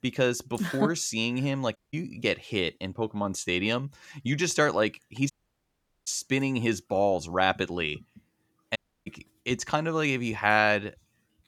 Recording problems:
audio cutting out; at 2 s, at 5.5 s for 1 s and at 9 s

